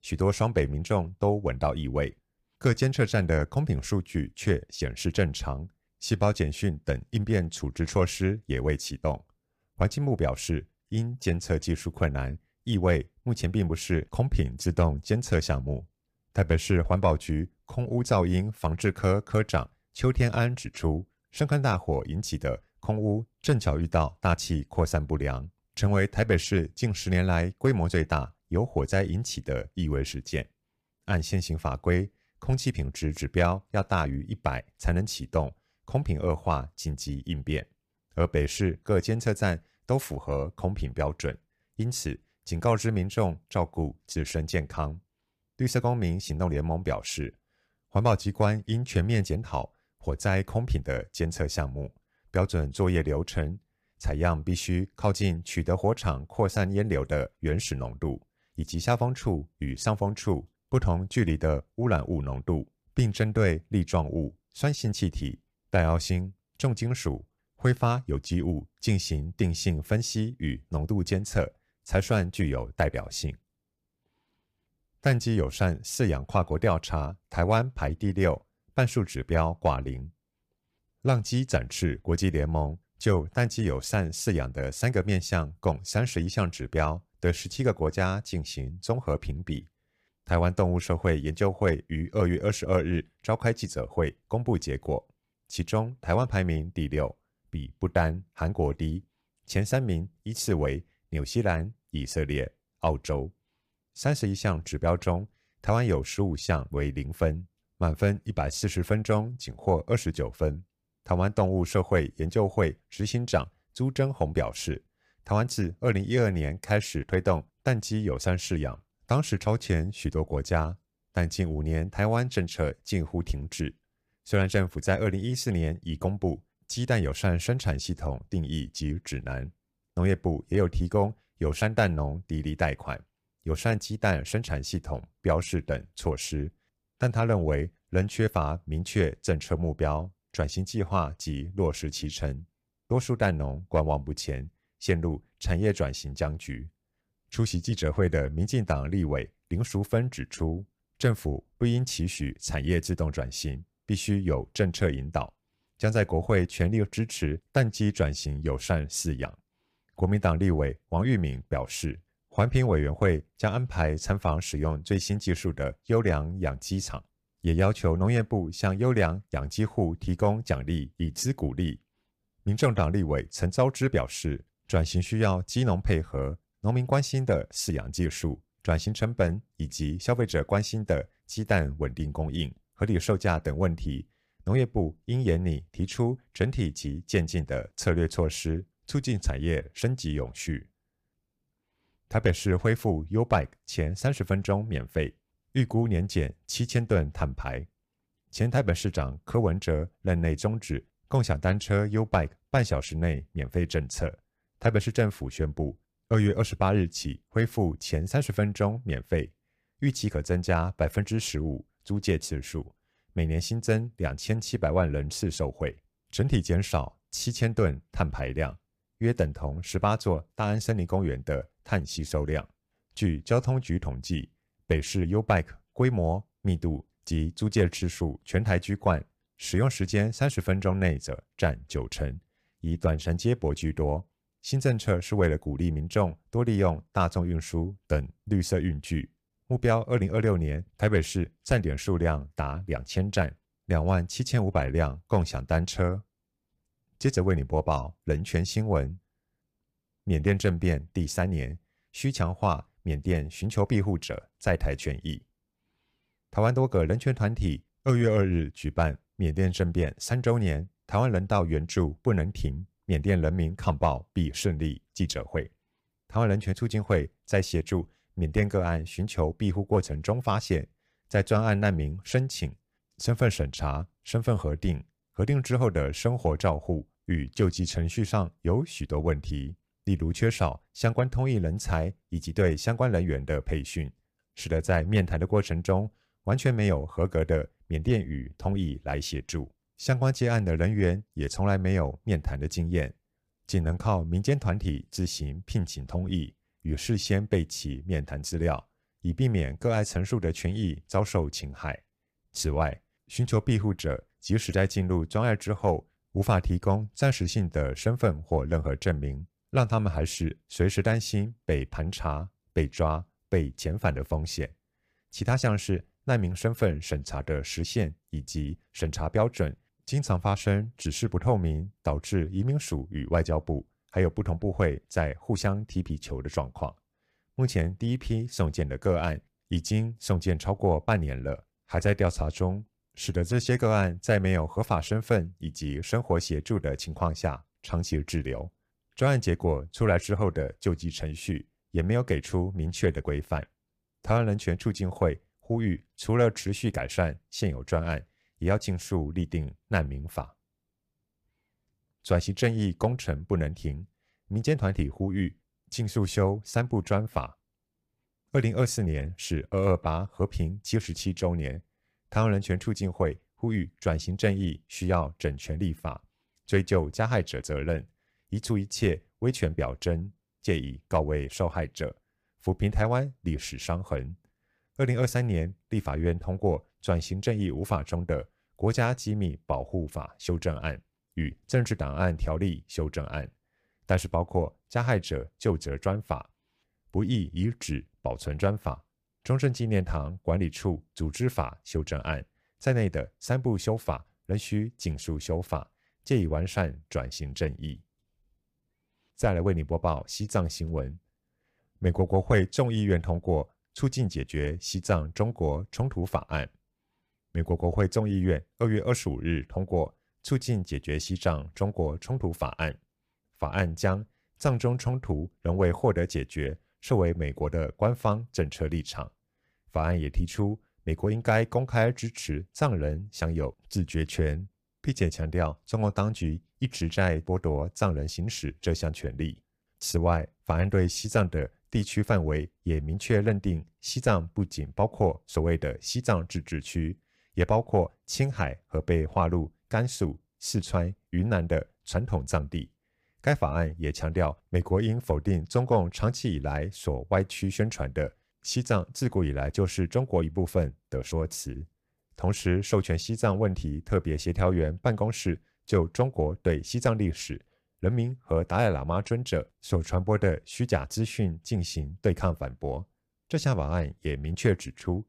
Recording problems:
none

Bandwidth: 15 kHz